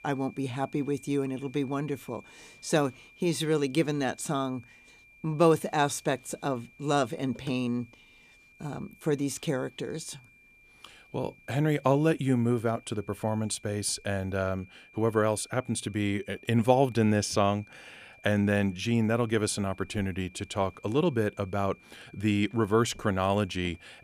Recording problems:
high-pitched whine; faint; throughout; 2.5 kHz, 25 dB below the speech

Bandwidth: 14.5 kHz